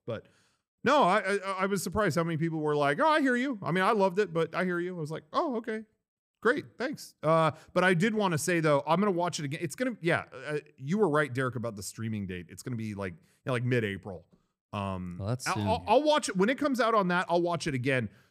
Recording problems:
none

